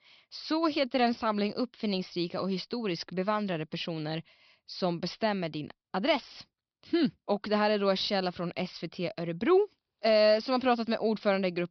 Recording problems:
high frequencies cut off; noticeable; nothing above 5.5 kHz

